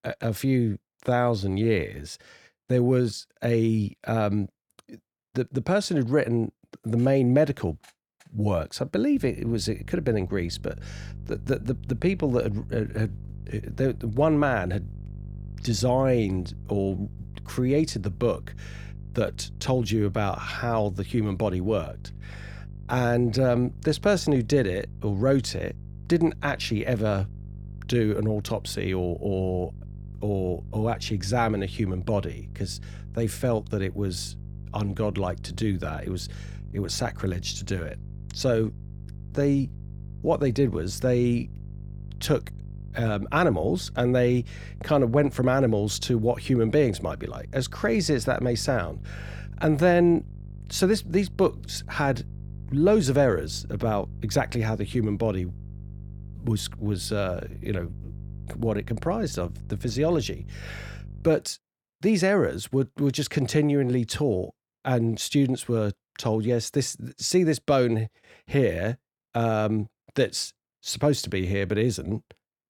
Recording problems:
electrical hum; faint; from 9 s to 1:01; 50 Hz, 25 dB below the speech

